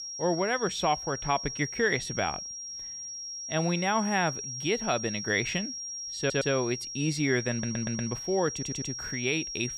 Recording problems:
high-pitched whine; loud; throughout; 5.5 kHz, 6 dB below the speech
audio stuttering; at 6 s, at 7.5 s and at 8.5 s

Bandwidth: 15 kHz